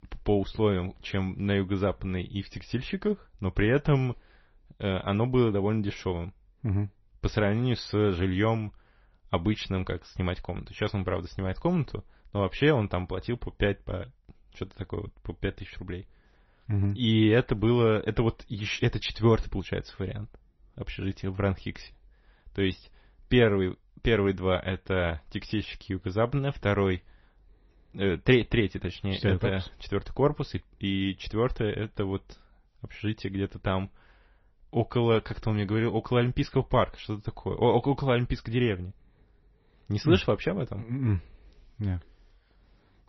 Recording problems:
garbled, watery; slightly; nothing above 6 kHz

